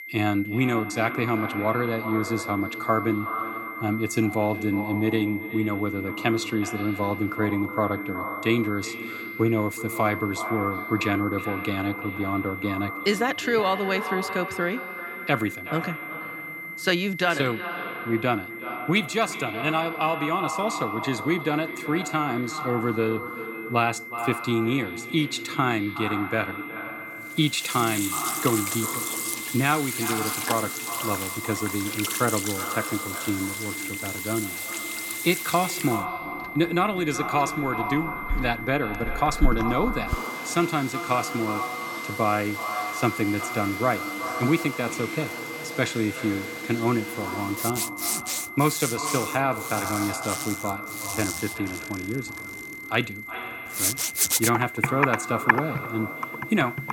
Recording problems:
echo of what is said; strong; throughout; 370 ms later, 9 dB below the speech
high-pitched whine; loud; throughout; 2 kHz, 9 dB below the speech
household noises; loud; from 28 s on; 4 dB below the speech

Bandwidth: 17 kHz